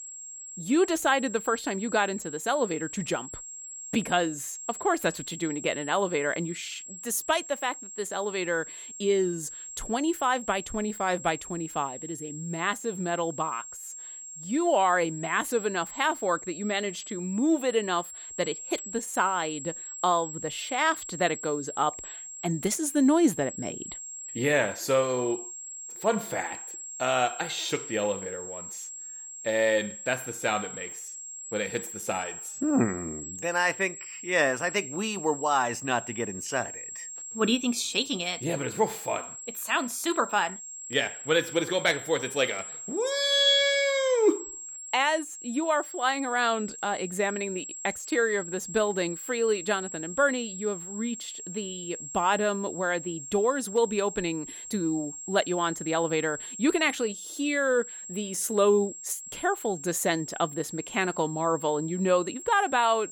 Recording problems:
high-pitched whine; noticeable; throughout; 7.5 kHz, 10 dB below the speech

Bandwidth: 18 kHz